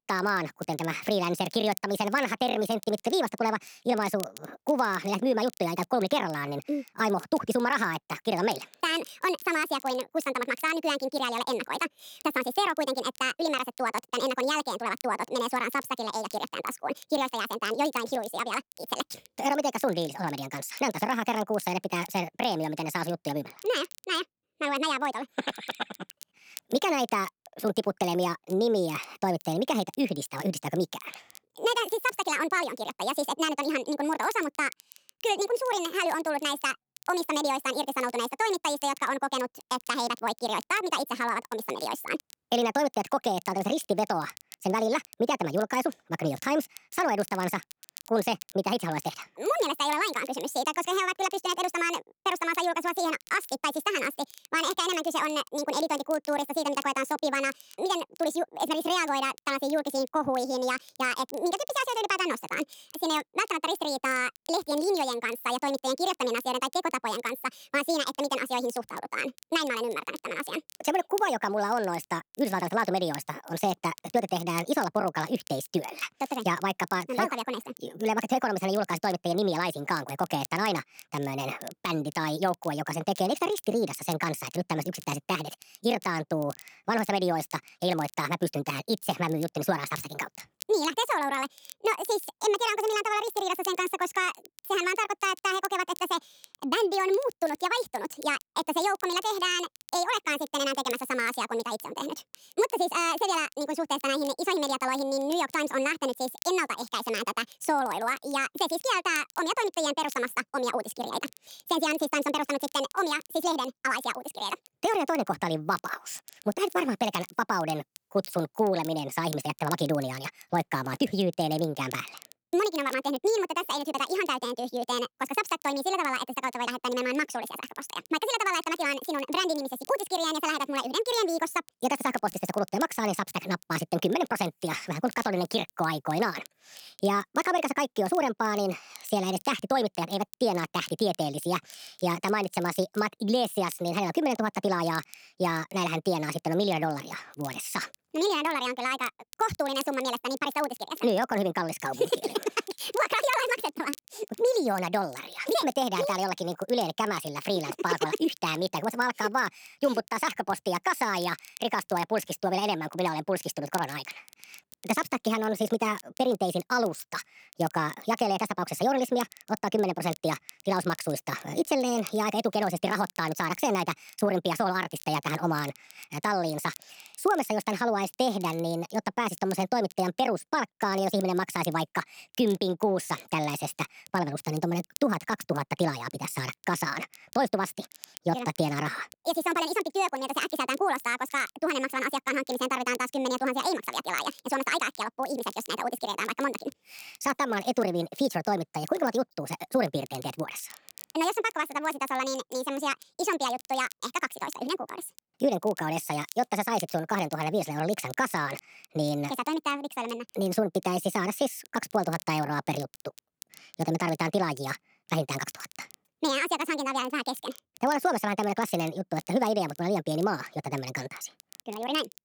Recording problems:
wrong speed and pitch; too fast and too high; 1.6 times normal speed
crackle, like an old record; faint; 20 dB below the speech

